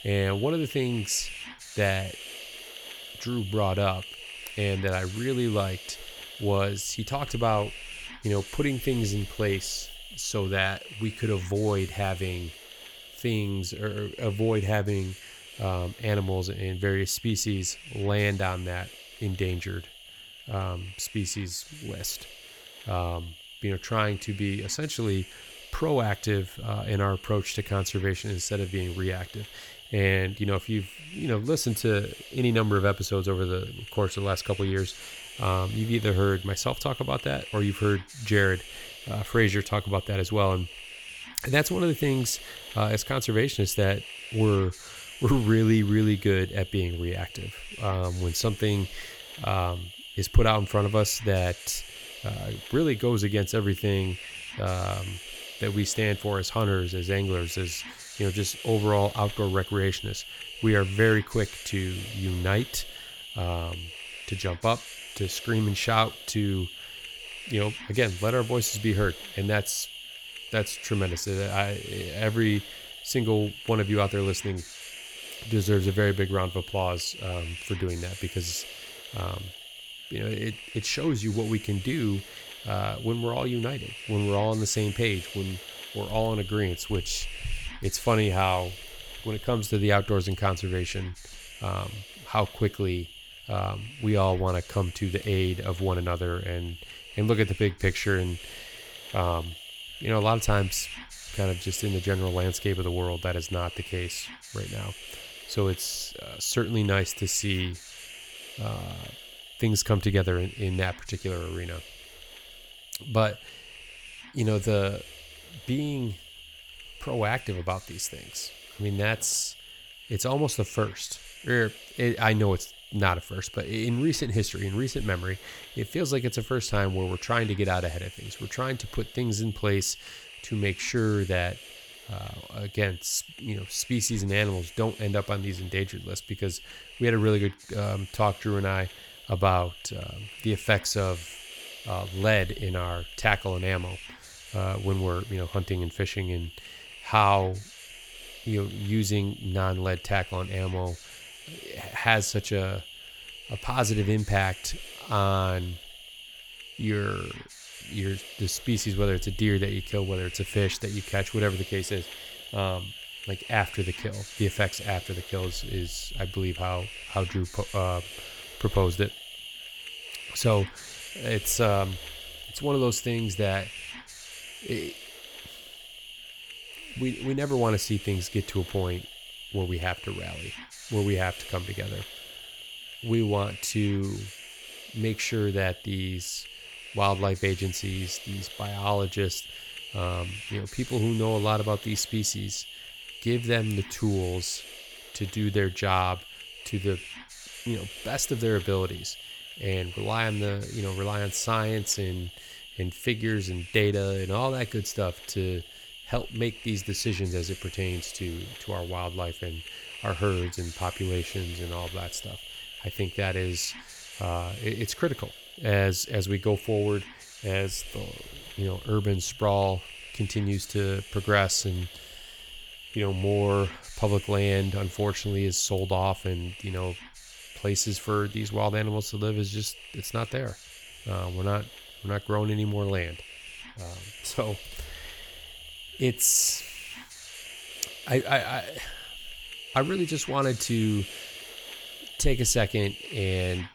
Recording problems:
hiss; noticeable; throughout; 10 dB below the speech

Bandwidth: 18 kHz